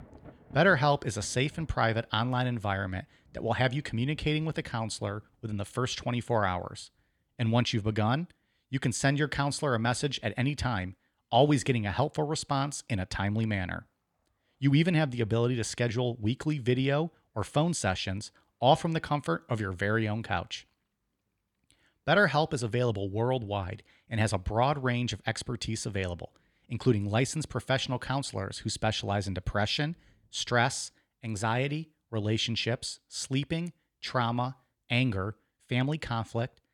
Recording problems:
rain or running water; faint; throughout; 30 dB below the speech

